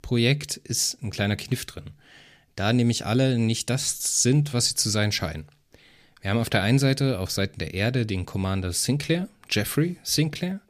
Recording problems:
none

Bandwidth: 14.5 kHz